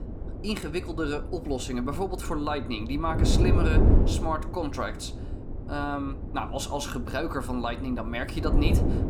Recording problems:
wind noise on the microphone; heavy; 6 dB below the speech

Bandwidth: 18.5 kHz